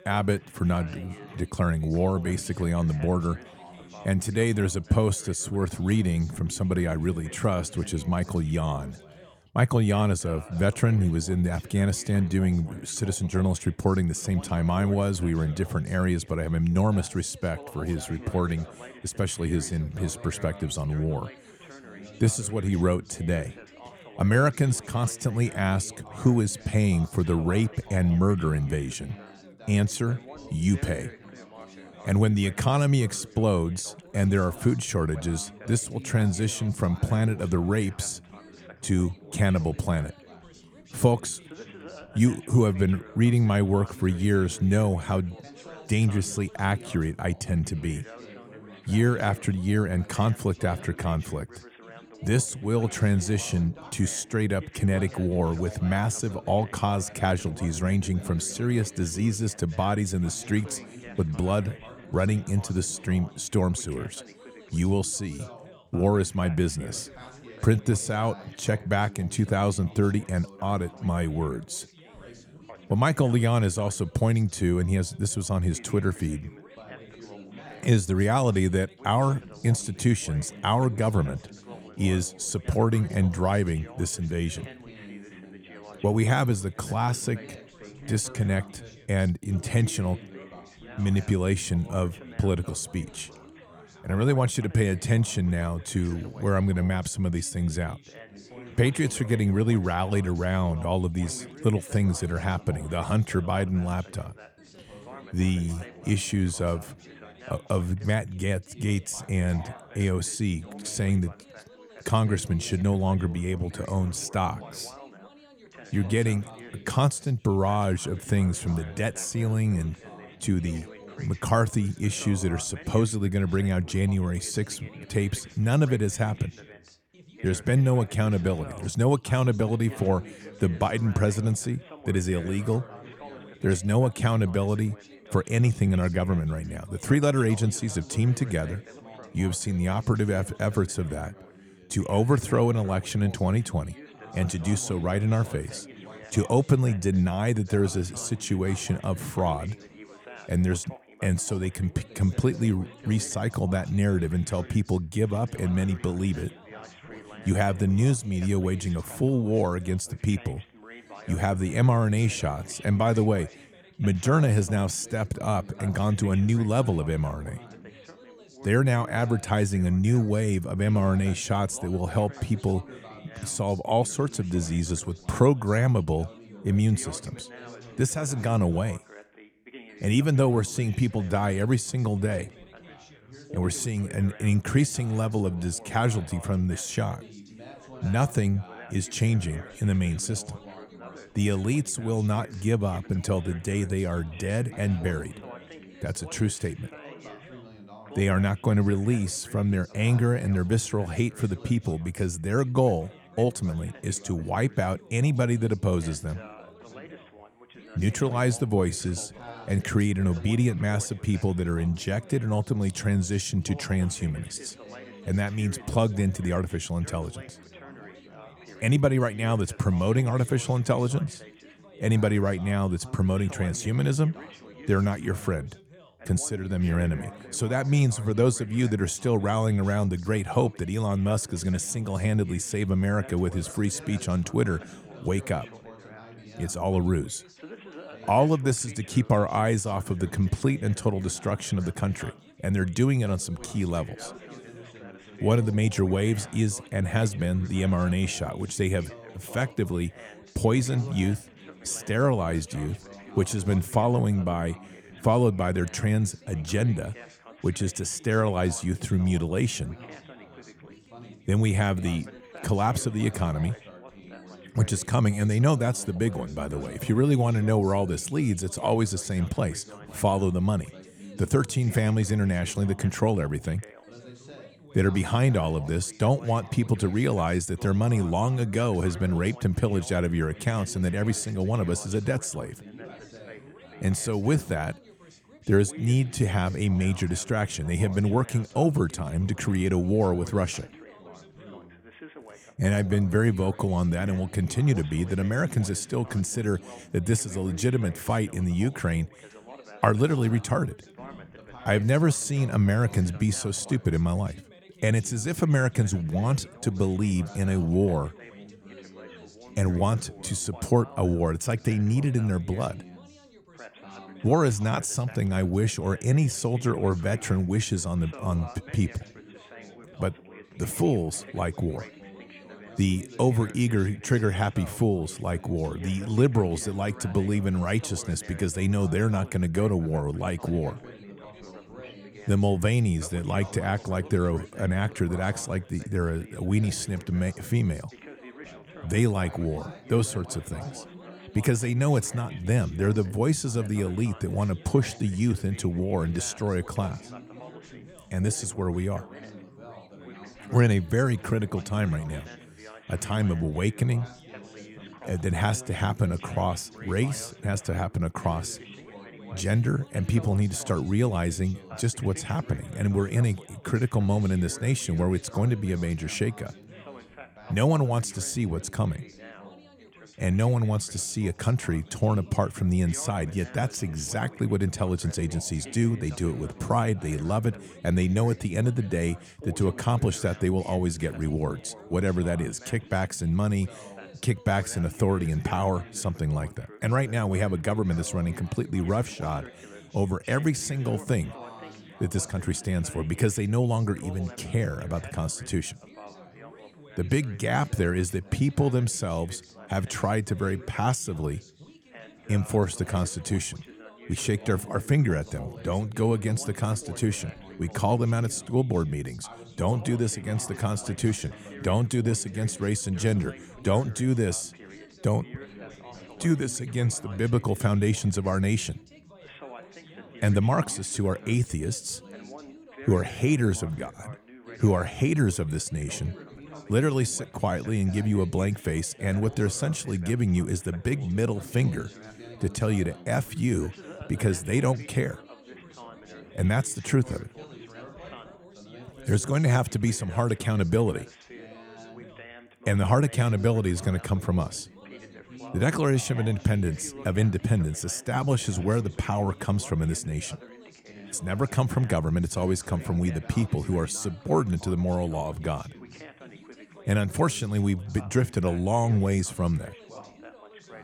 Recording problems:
background chatter; noticeable; throughout; 3 voices, 20 dB below the speech

